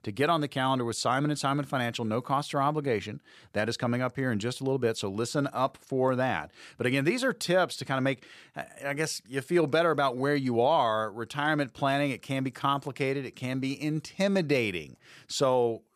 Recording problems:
none

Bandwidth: 14 kHz